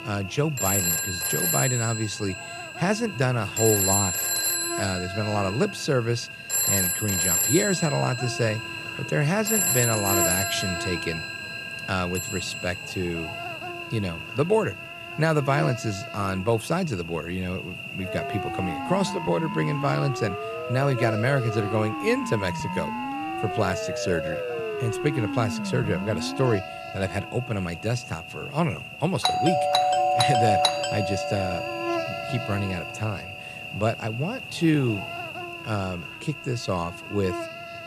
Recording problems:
alarms or sirens; very loud; throughout; 1 dB above the speech
electrical hum; loud; throughout; 60 Hz, 5 dB below the speech

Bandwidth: 13.5 kHz